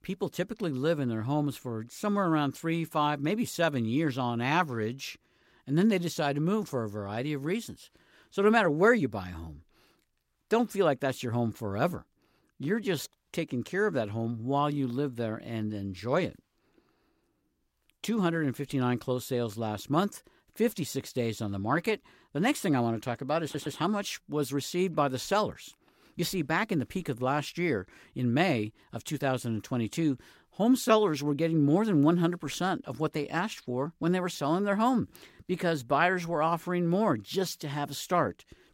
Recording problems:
audio stuttering; at 23 s

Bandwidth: 16 kHz